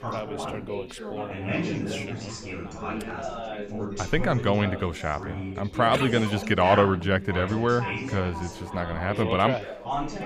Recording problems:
chatter from many people; loud; throughout; 8 dB below the speech

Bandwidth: 15 kHz